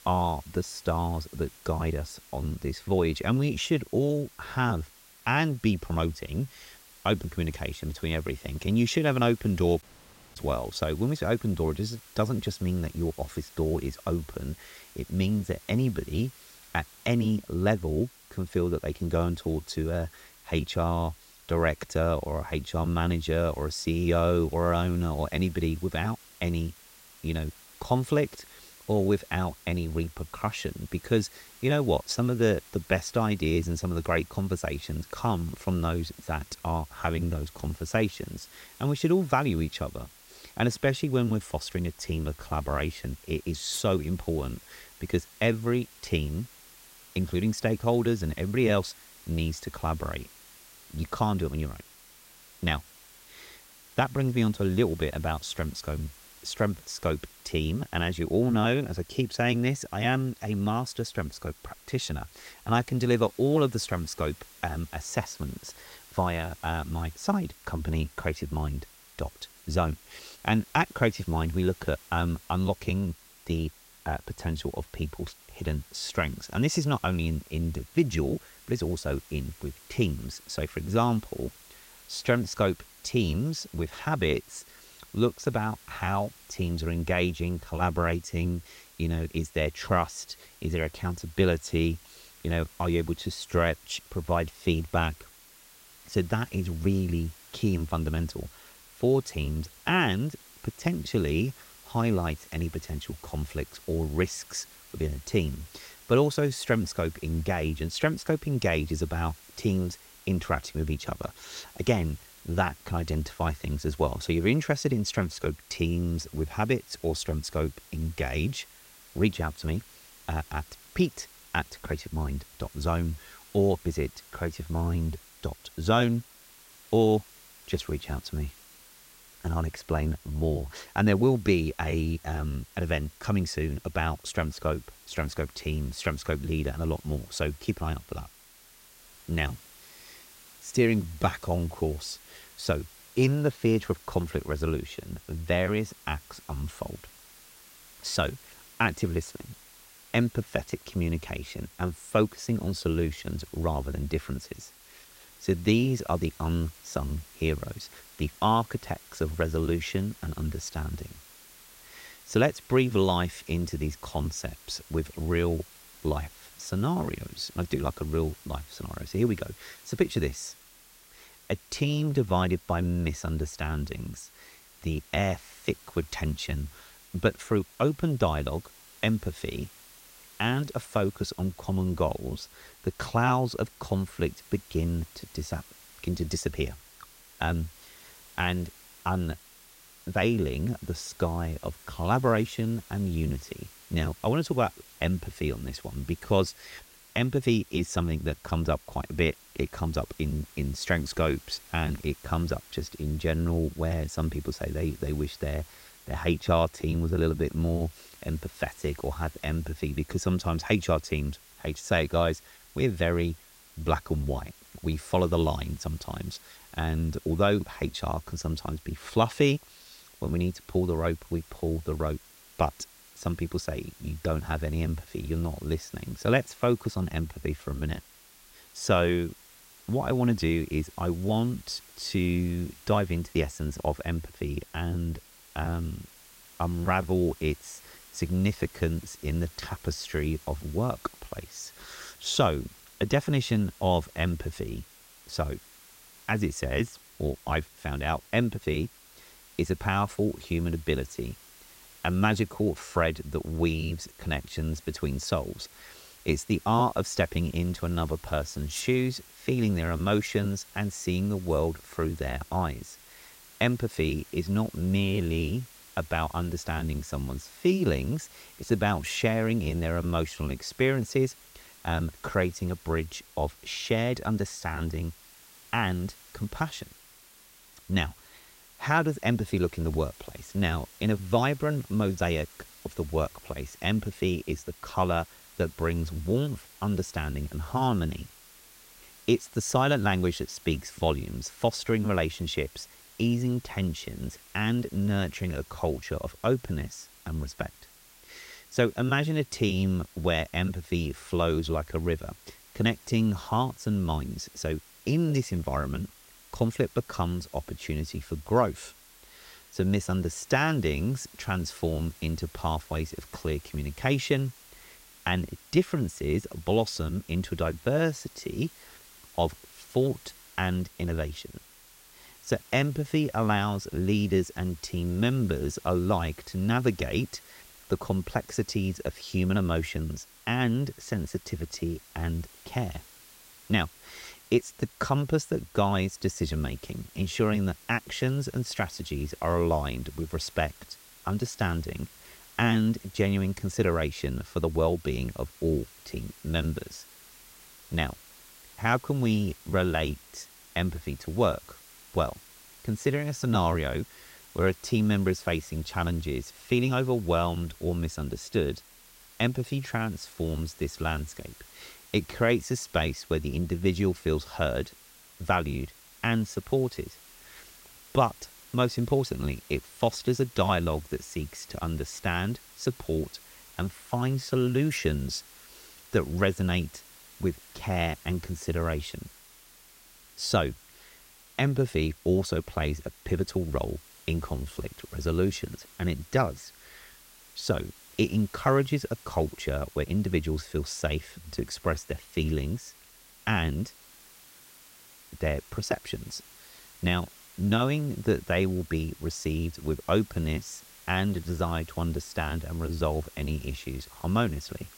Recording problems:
hiss; faint; throughout; 20 dB below the speech
audio cutting out; at 10 s for 0.5 s

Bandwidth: 16 kHz